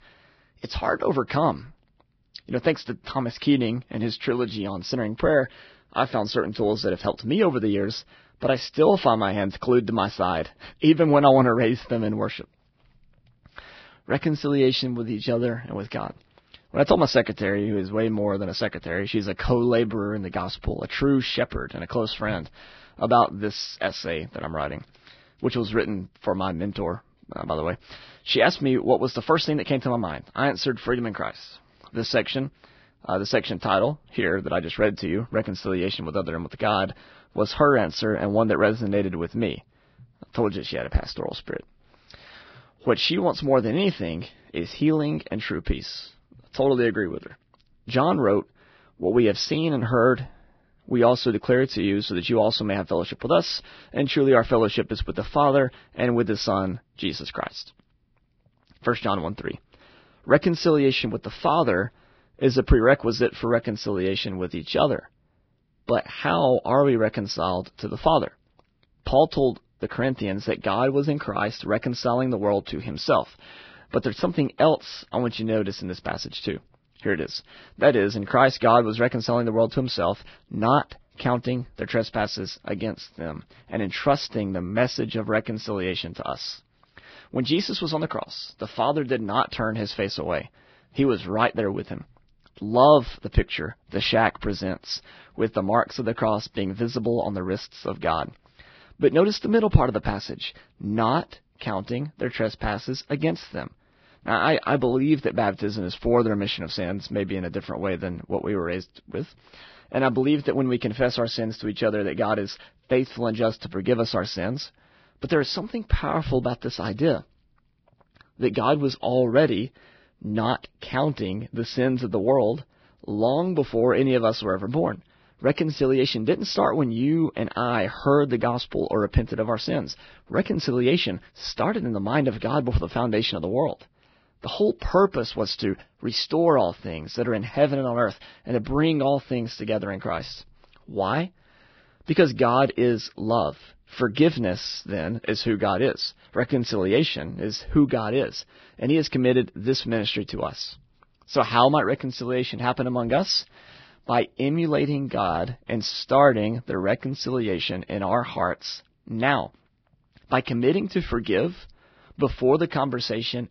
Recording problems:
garbled, watery; badly; nothing above 5.5 kHz

